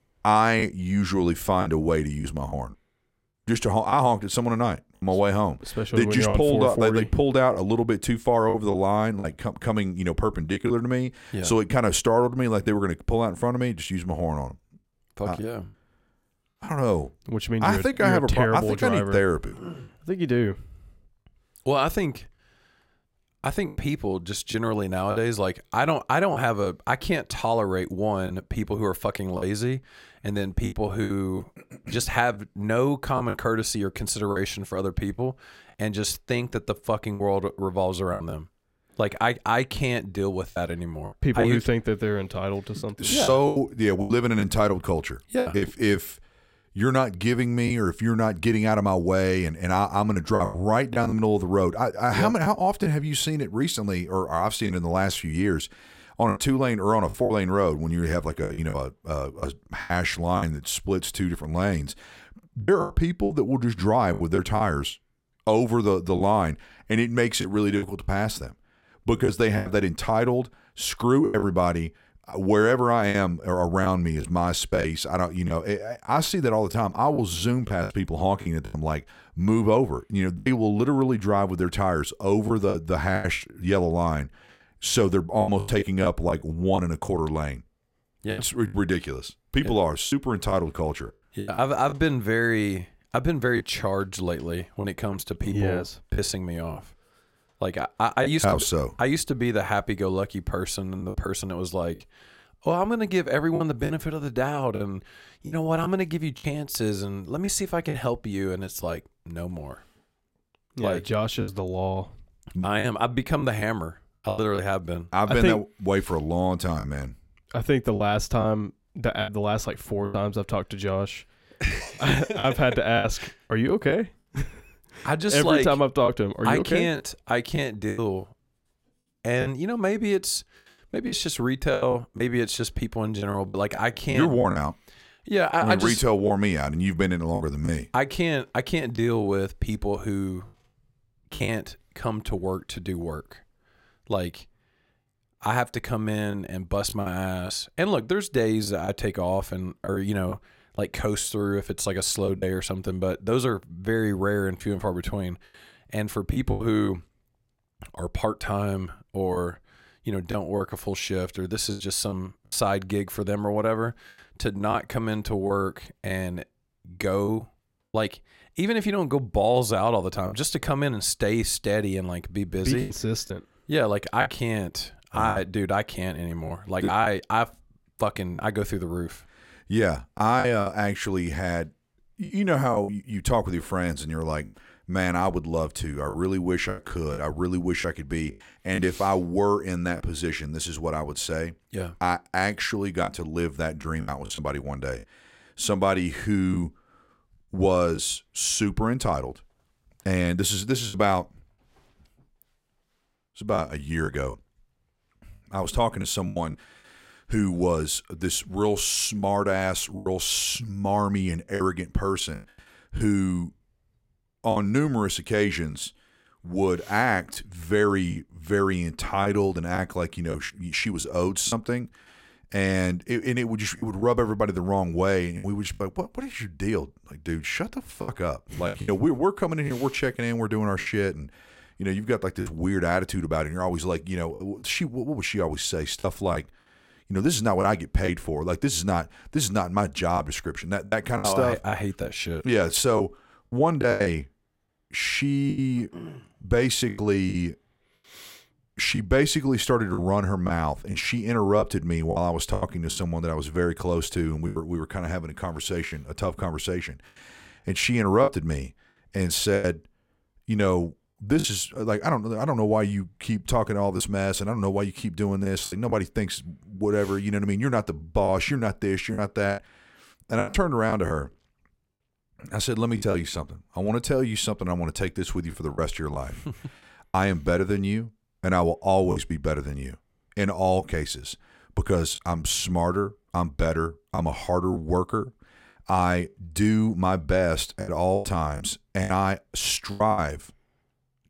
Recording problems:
choppy; very; 5% of the speech affected

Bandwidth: 16 kHz